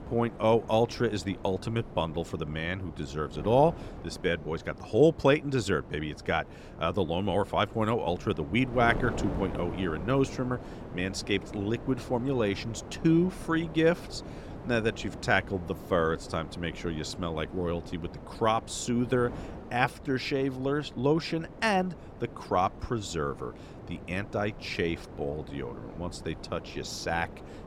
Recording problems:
wind noise on the microphone; occasional gusts; 15 dB below the speech

